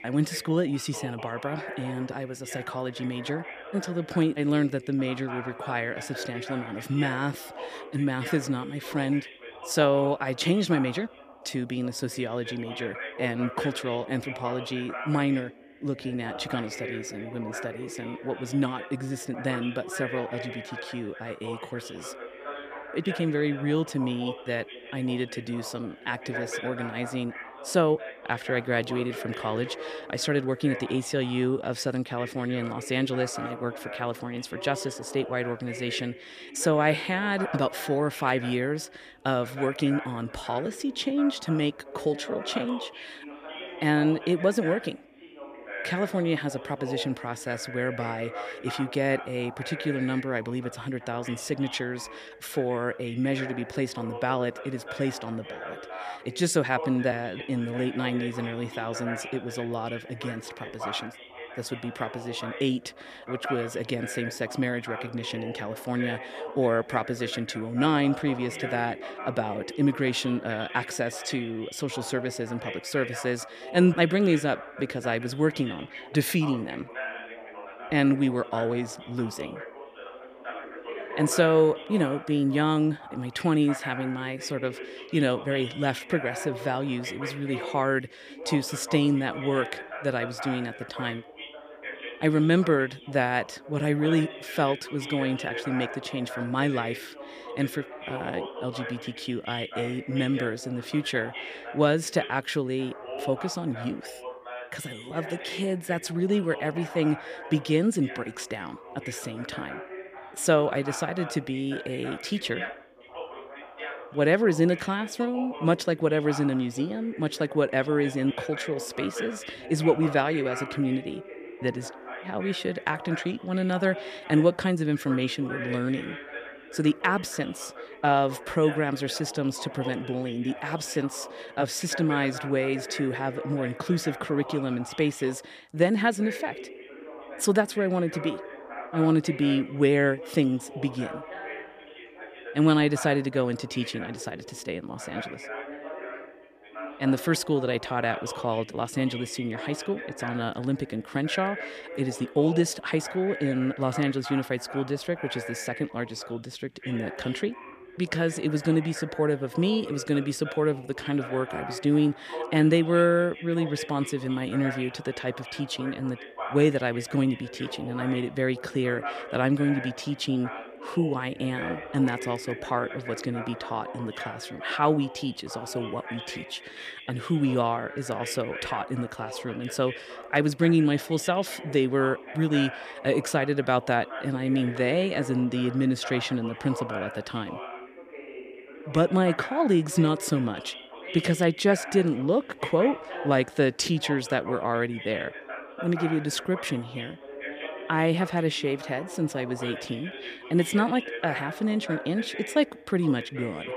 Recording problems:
background chatter; noticeable; throughout; 2 voices, 10 dB below the speech

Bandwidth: 15 kHz